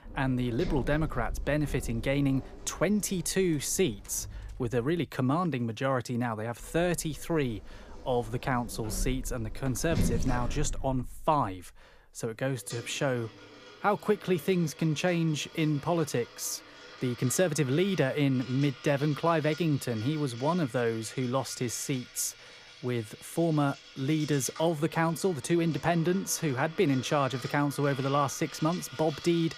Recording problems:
household noises; noticeable; throughout; 15 dB below the speech

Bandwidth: 15 kHz